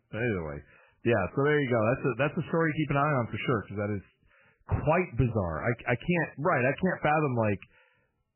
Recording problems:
garbled, watery; badly; nothing above 3 kHz

